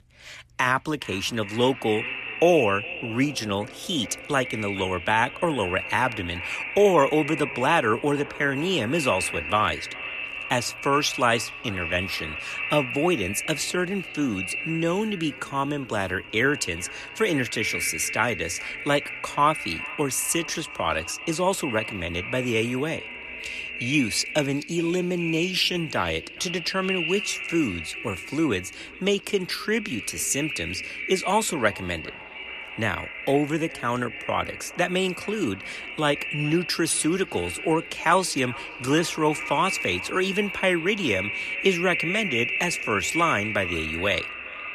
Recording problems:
echo of what is said; strong; throughout; 420 ms later, 6 dB below the speech

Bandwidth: 14 kHz